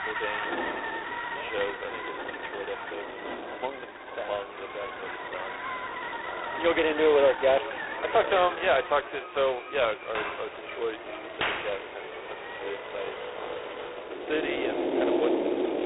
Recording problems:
phone-call audio; poor line; nothing above 4 kHz
echo of what is said; noticeable; throughout; 430 ms later, 15 dB below the speech
rain or running water; loud; throughout; 7 dB below the speech
traffic noise; loud; throughout; 8 dB below the speech

